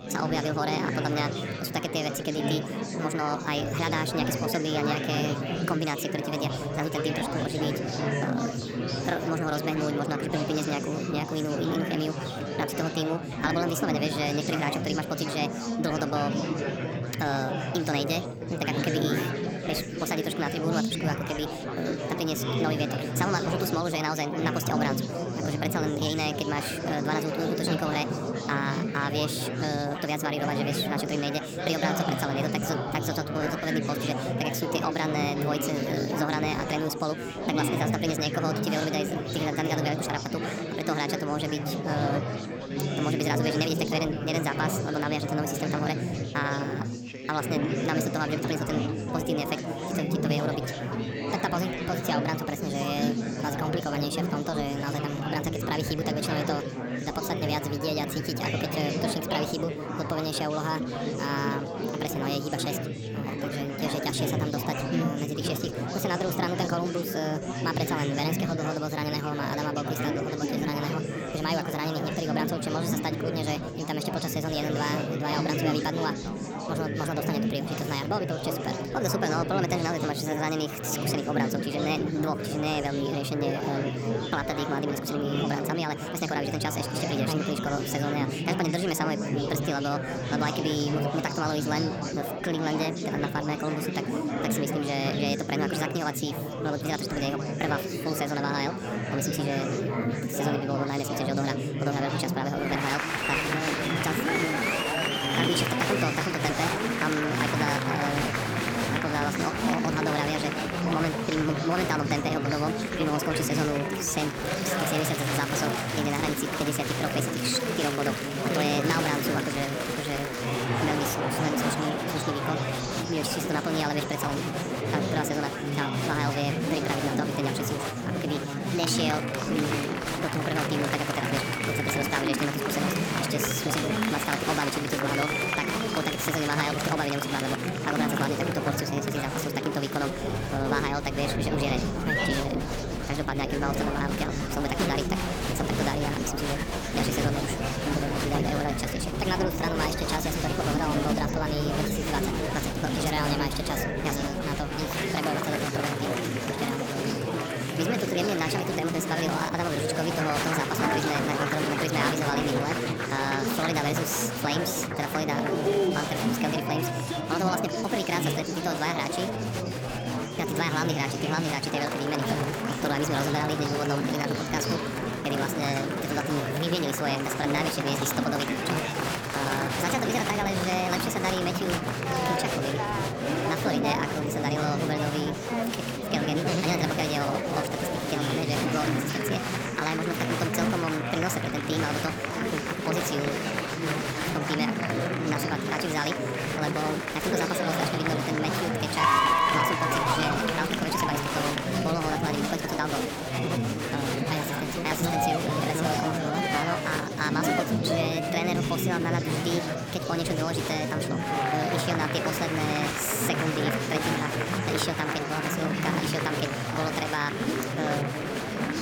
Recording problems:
wrong speed and pitch; too fast and too high; 1.5 times normal speed
chatter from many people; very loud; throughout; 1 dB above the speech

